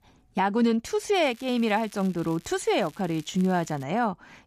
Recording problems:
crackling; faint; from 1 to 4 s; 25 dB below the speech

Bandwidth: 14.5 kHz